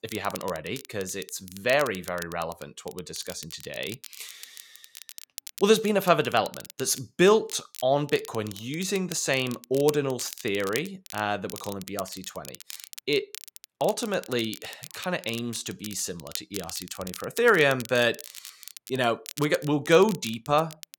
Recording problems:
crackle, like an old record; noticeable; 15 dB below the speech

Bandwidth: 17 kHz